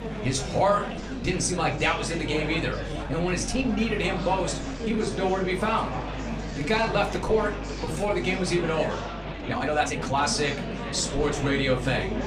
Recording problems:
room echo; very slight; dies away in 0.3 s
off-mic speech; somewhat distant
murmuring crowd; loud; throughout; 7 dB below the speech
train or aircraft noise; noticeable; until 8.5 s; 15 dB below the speech
electrical hum; faint; throughout; 50 Hz, 25 dB below the speech
uneven, jittery; strongly; from 0.5 to 11 s

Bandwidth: 14.5 kHz